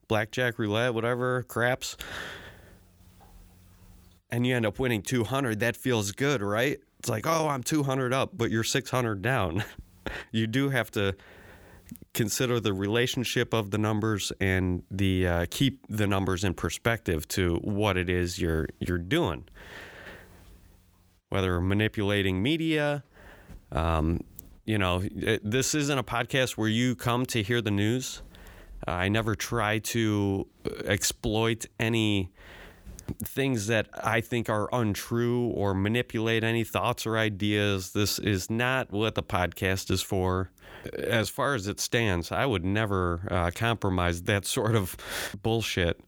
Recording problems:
none

